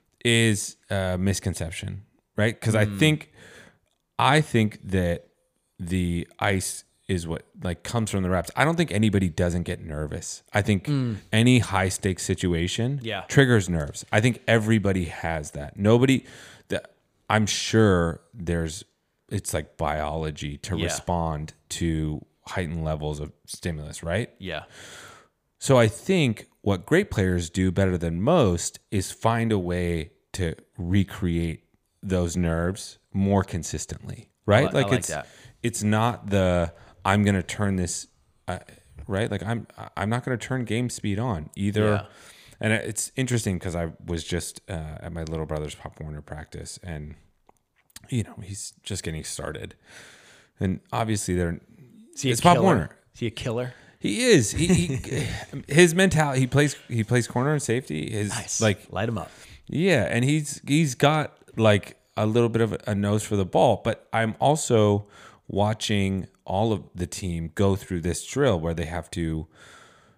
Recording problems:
none

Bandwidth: 15 kHz